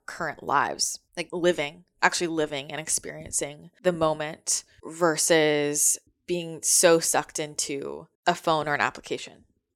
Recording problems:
none

